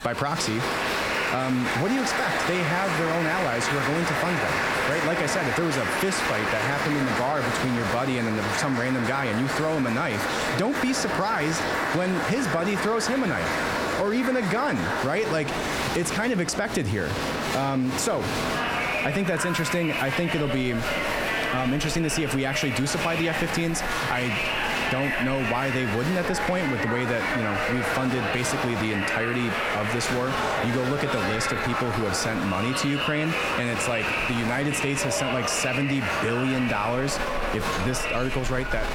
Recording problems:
squashed, flat; somewhat
crowd noise; loud; throughout; as loud as the speech

